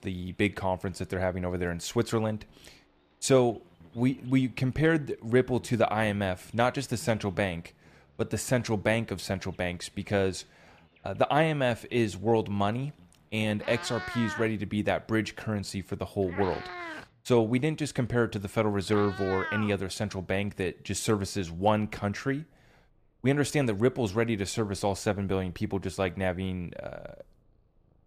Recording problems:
animal sounds; noticeable; throughout; 10 dB below the speech

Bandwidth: 14.5 kHz